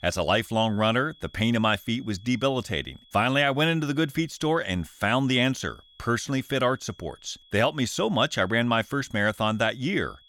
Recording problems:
high-pitched whine; faint; throughout; 3.5 kHz, 30 dB below the speech

